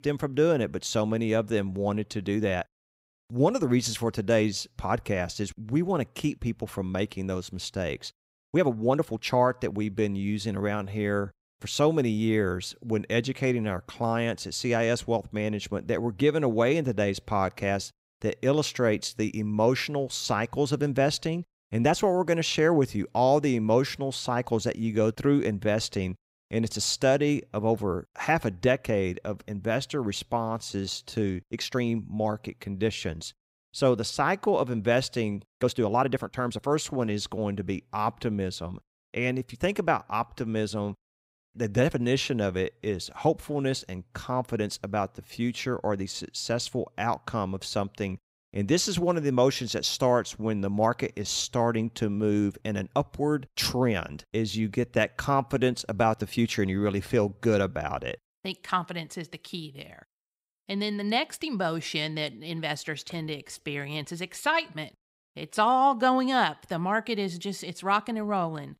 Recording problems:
uneven, jittery; strongly; from 2.5 s to 1:06

